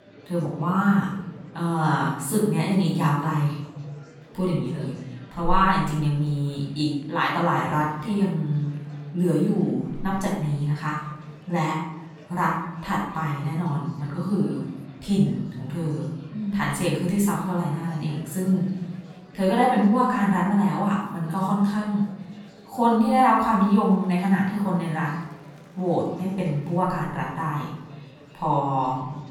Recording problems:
off-mic speech; far
room echo; noticeable; dies away in 0.8 s
murmuring crowd; faint; throughout; 25 dB below the speech

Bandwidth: 17 kHz